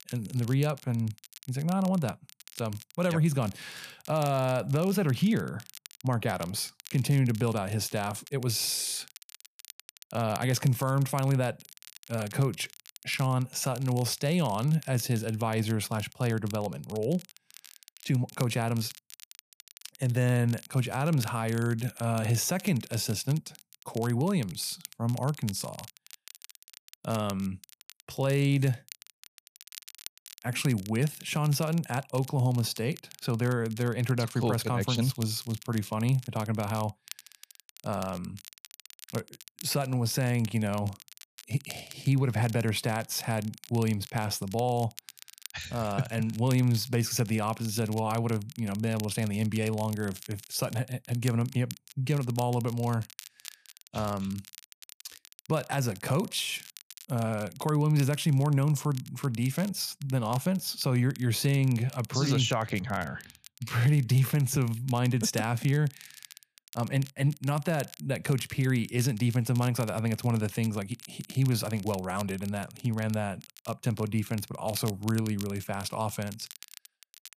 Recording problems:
crackle, like an old record; noticeable; 20 dB below the speech

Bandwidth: 14.5 kHz